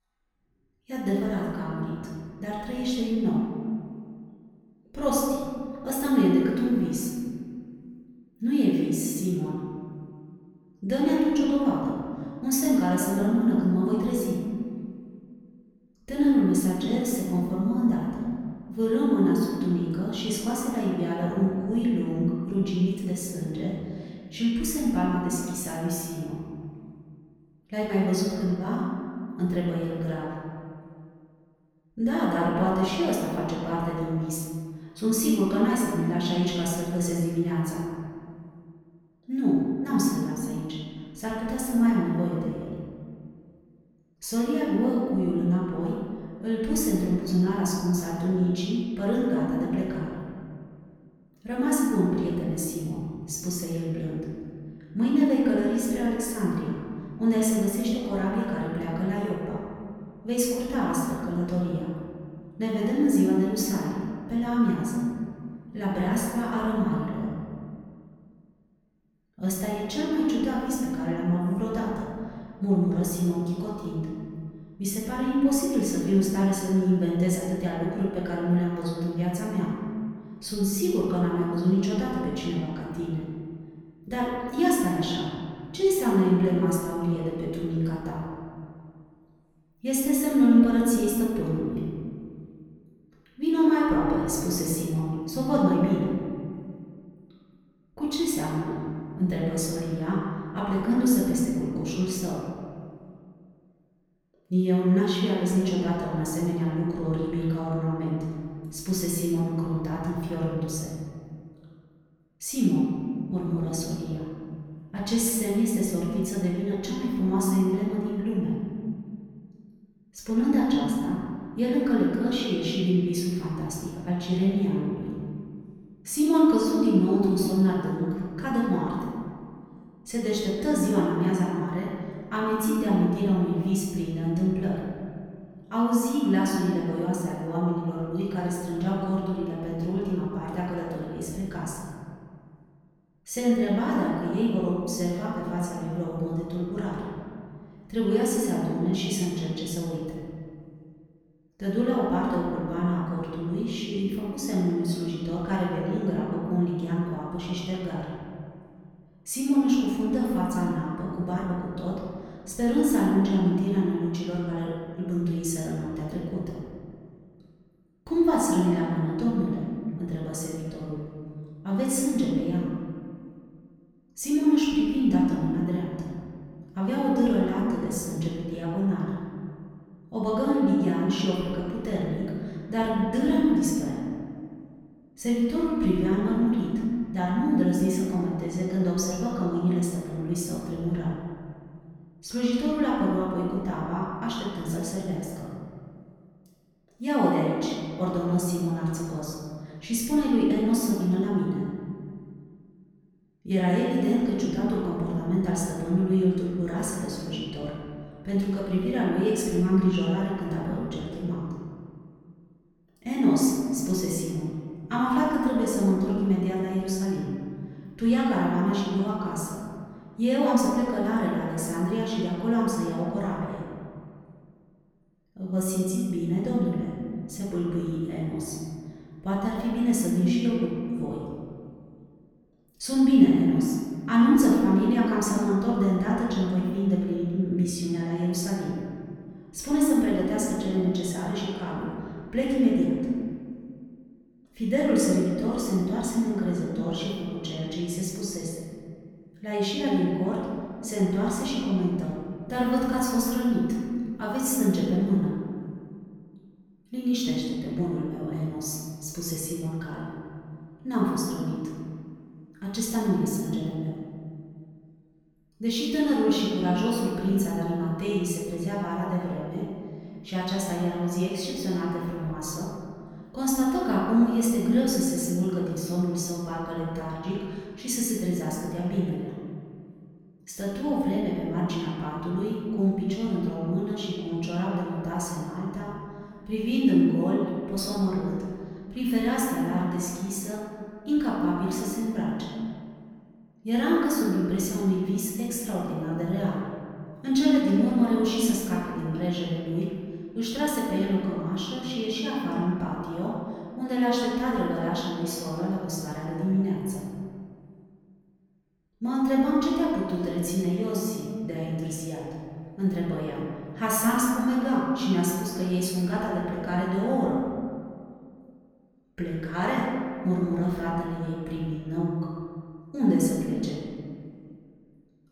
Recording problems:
off-mic speech; far
room echo; noticeable; dies away in 1.9 s

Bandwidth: 18 kHz